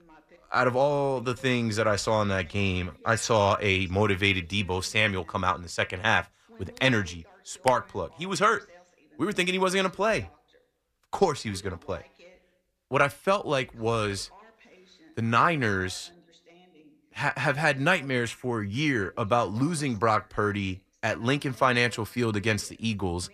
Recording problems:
voice in the background; faint; throughout; 30 dB below the speech

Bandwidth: 14.5 kHz